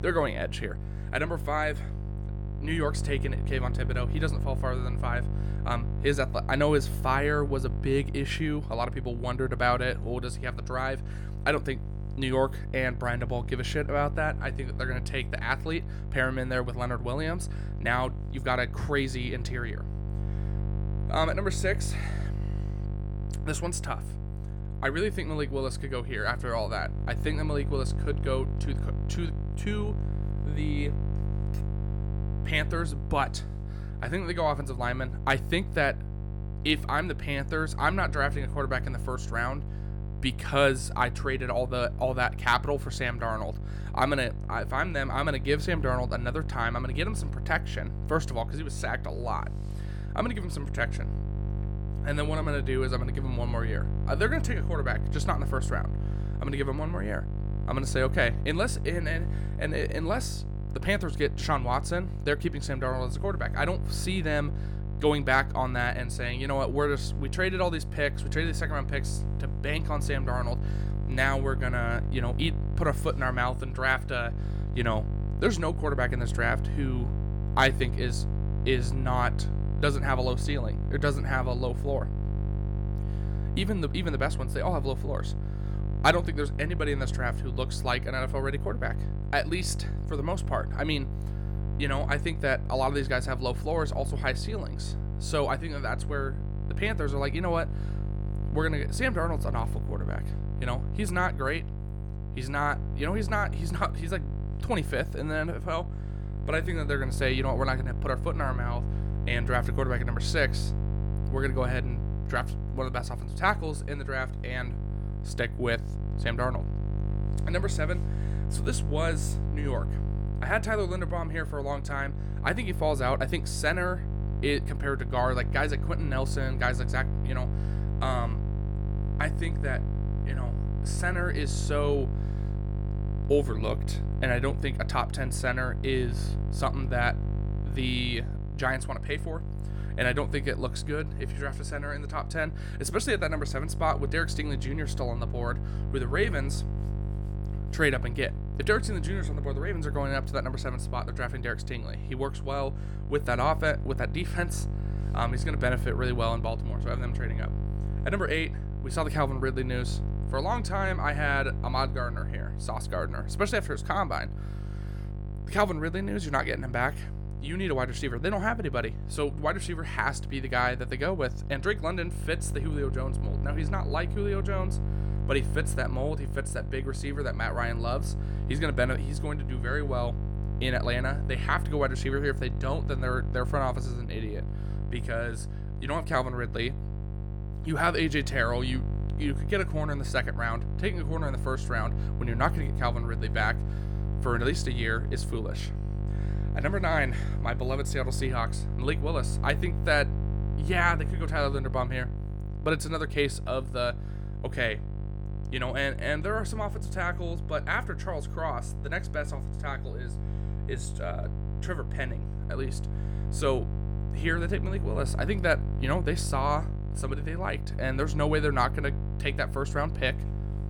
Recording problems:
electrical hum; noticeable; throughout; 50 Hz, 15 dB below the speech

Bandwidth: 18 kHz